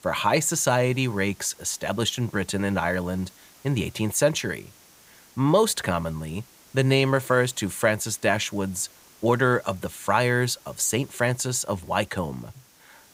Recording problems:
hiss; faint; throughout; 25 dB below the speech

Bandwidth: 15.5 kHz